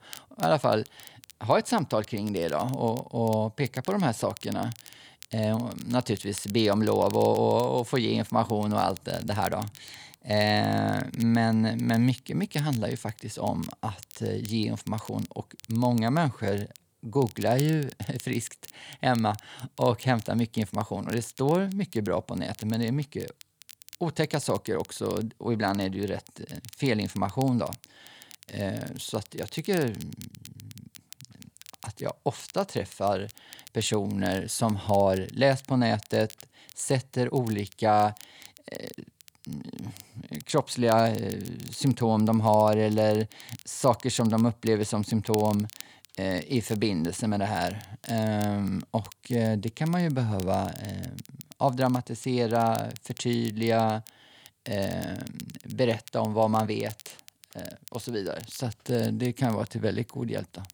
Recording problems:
crackle, like an old record; noticeable; 20 dB below the speech

